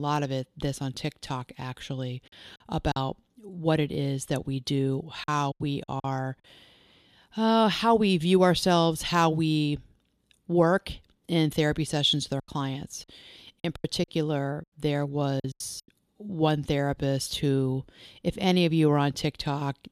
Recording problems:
abrupt cut into speech; at the start
choppy; very; at 3 s, at 5 s and from 12 to 16 s; 10% of the speech affected

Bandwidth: 14 kHz